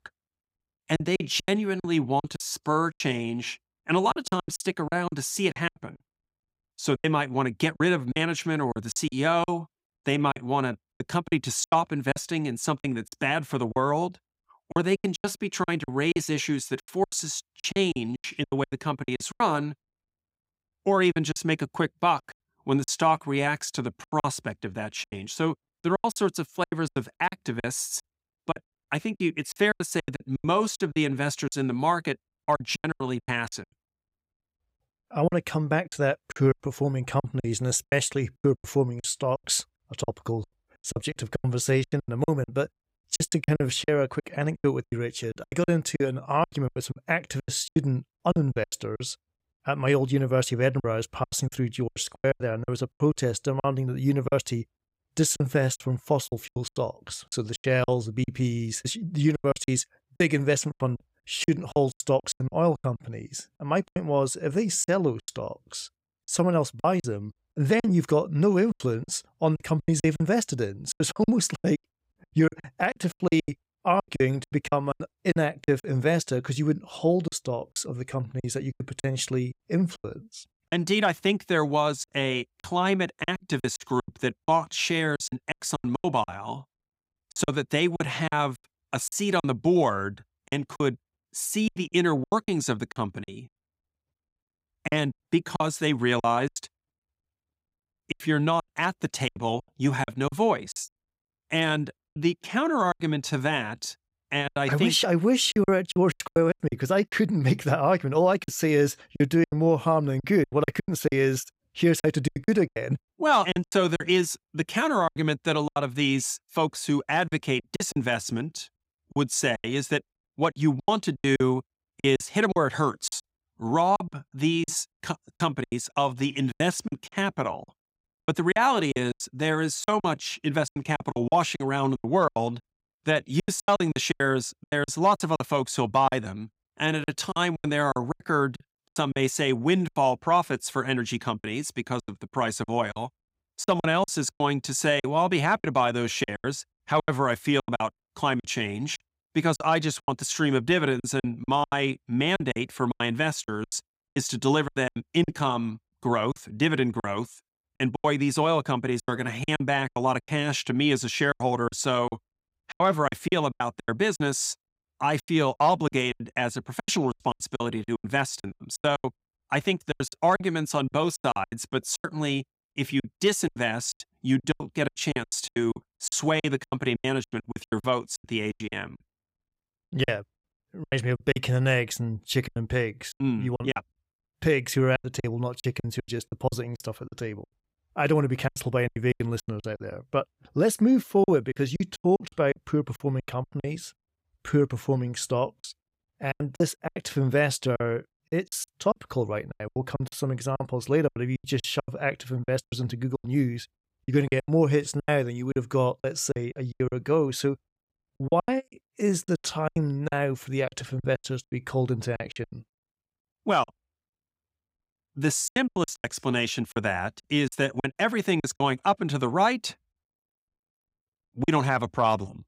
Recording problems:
choppy; very; 15% of the speech affected

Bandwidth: 15.5 kHz